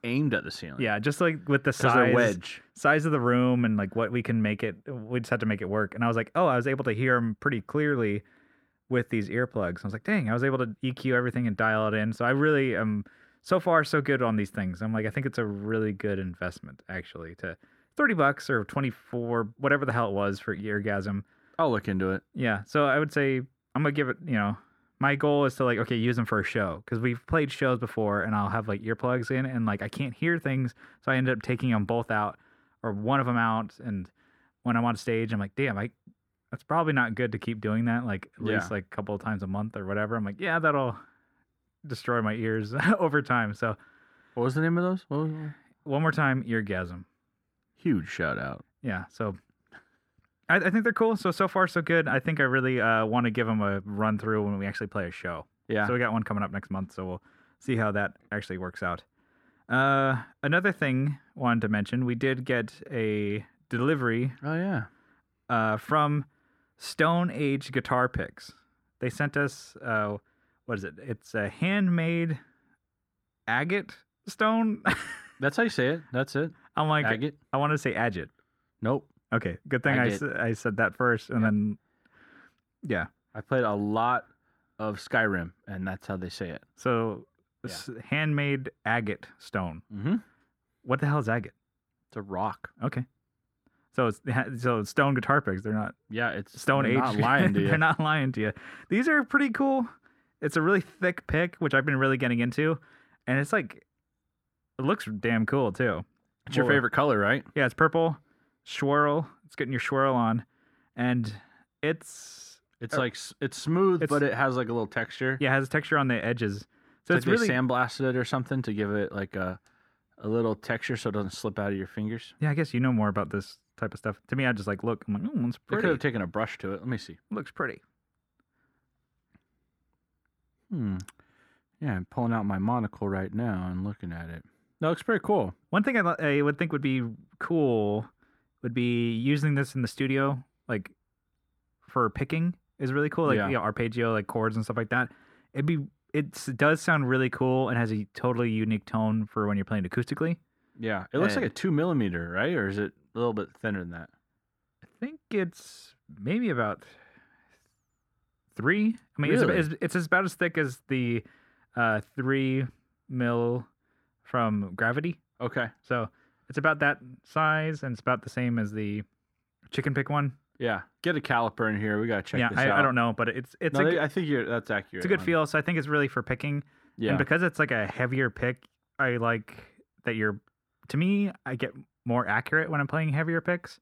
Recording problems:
muffled; slightly; fading above 3 kHz

